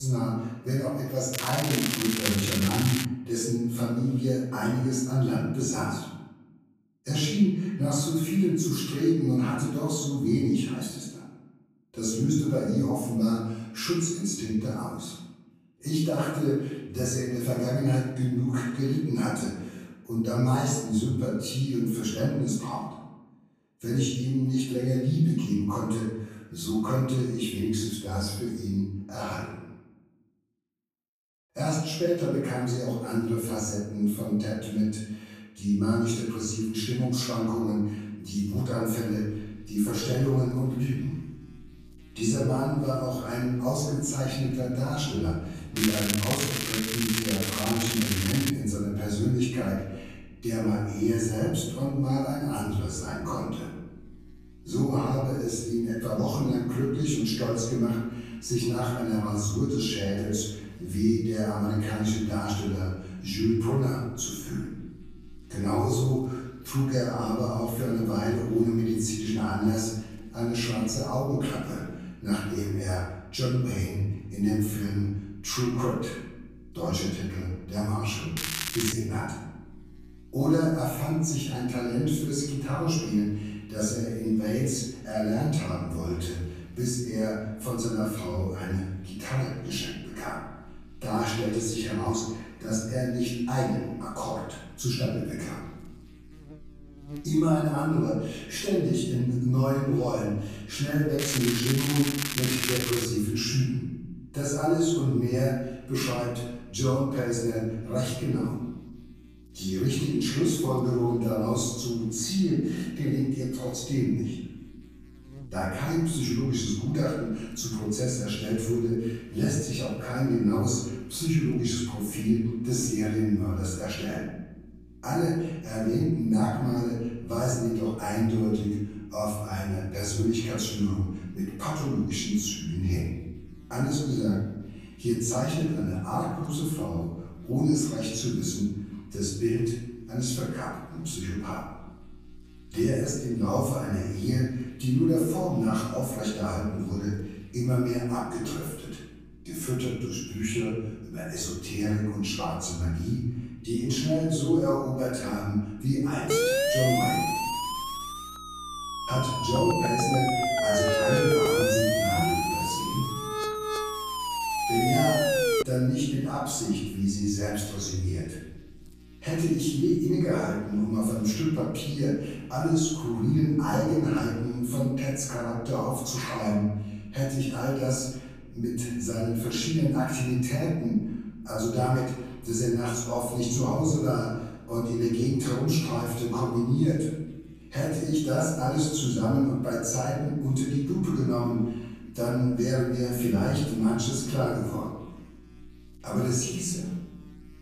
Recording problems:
off-mic speech; far
room echo; noticeable; dies away in 1 s
crackling; loud; 4 times, first at 1.5 s; 2 dB below the speech
electrical hum; faint; from 39 s on; 60 Hz, 25 dB below the speech
abrupt cut into speech; at the start
siren; loud; from 2:36 to 2:46; peak 5 dB above the speech

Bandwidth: 14.5 kHz